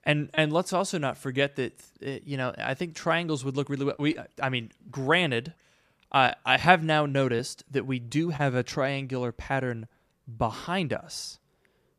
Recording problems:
none

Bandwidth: 14.5 kHz